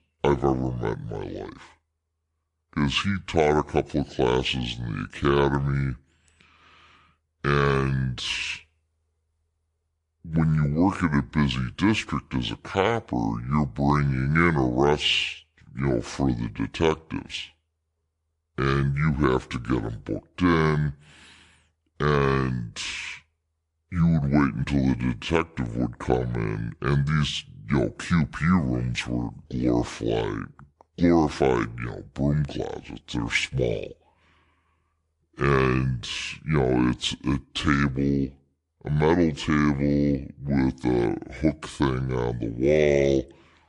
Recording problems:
wrong speed and pitch; too slow and too low; 0.7 times normal speed

